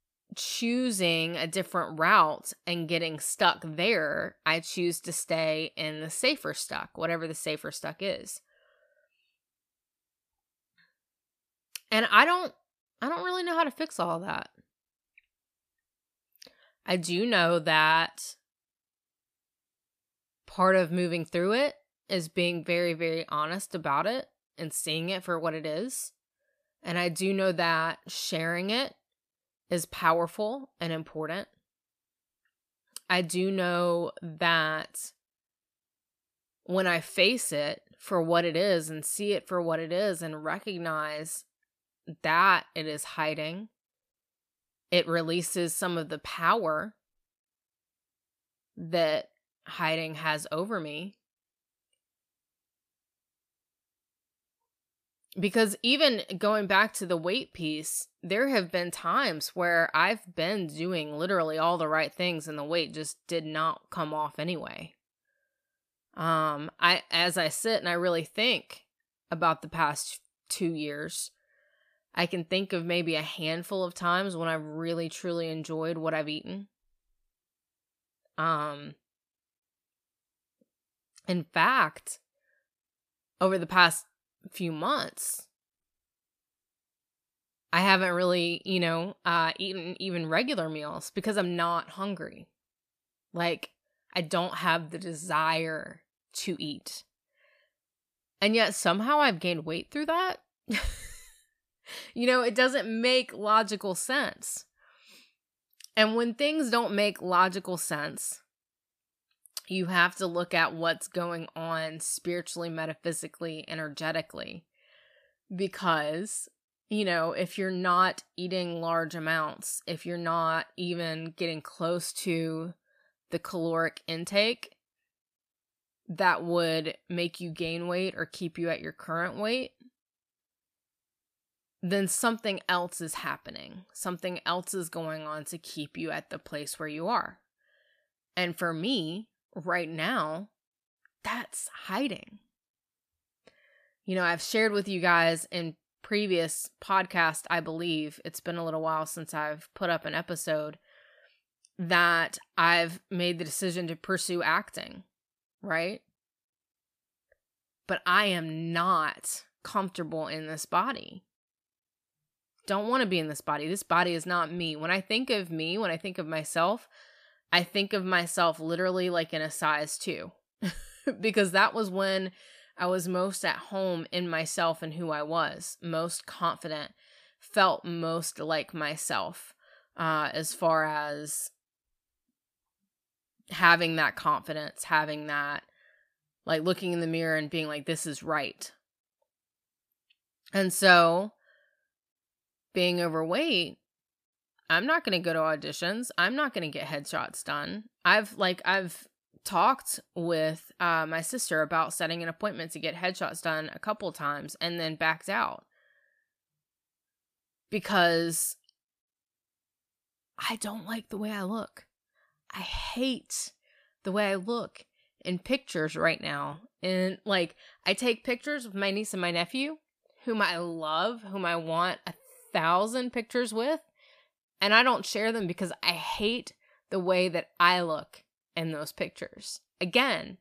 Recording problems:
none

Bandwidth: 14.5 kHz